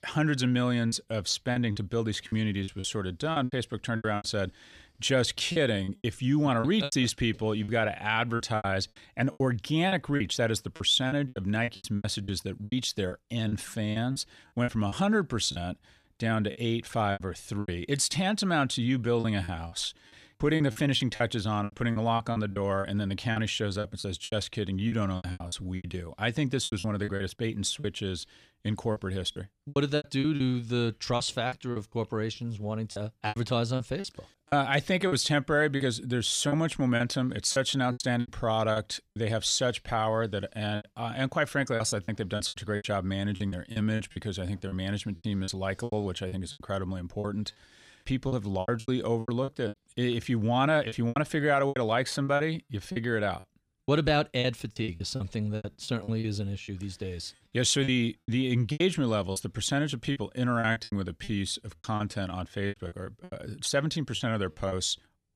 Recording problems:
choppy; very; 13% of the speech affected

